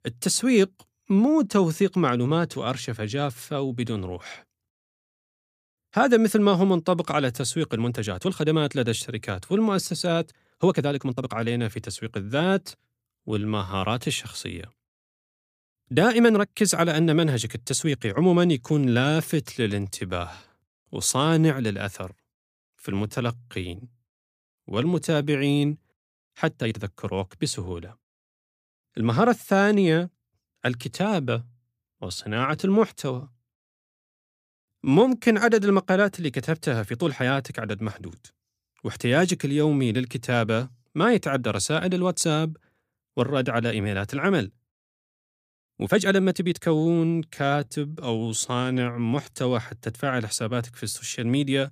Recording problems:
uneven, jittery; strongly; from 1 to 49 s

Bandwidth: 15 kHz